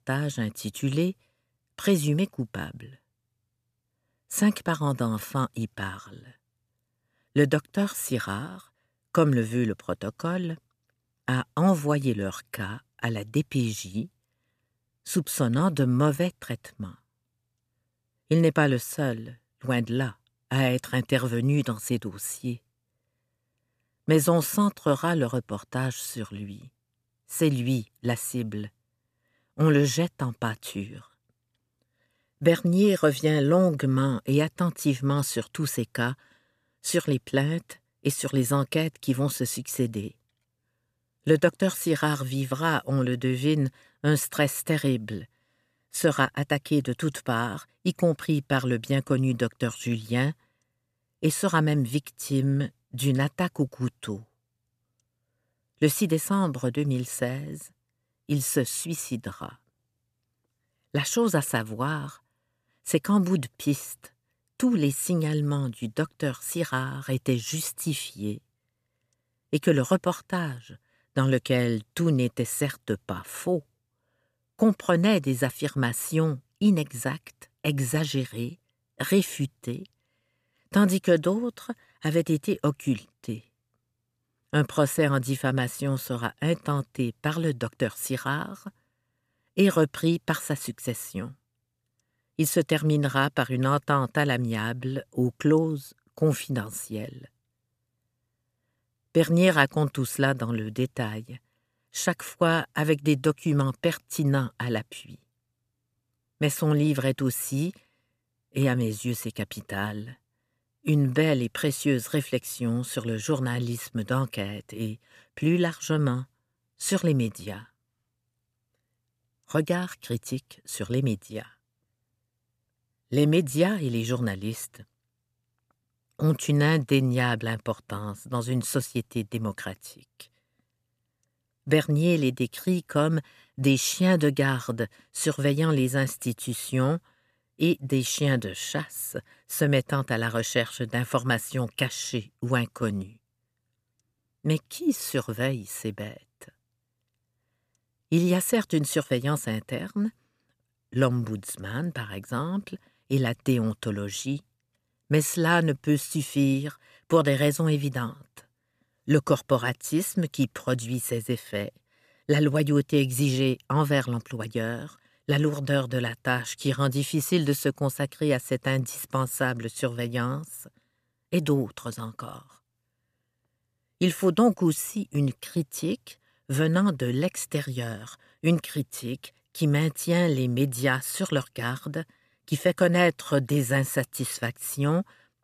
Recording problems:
none

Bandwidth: 14.5 kHz